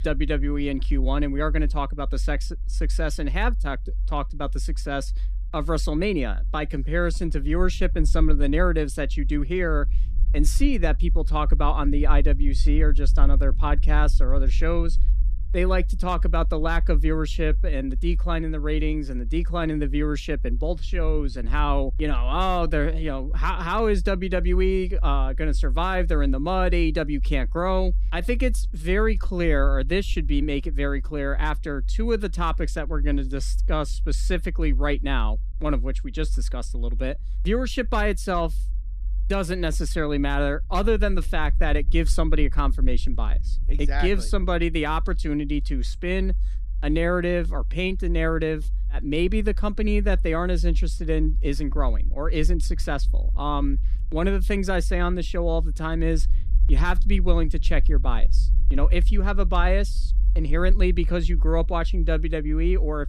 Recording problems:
low rumble; faint; throughout; 25 dB below the speech

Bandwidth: 14.5 kHz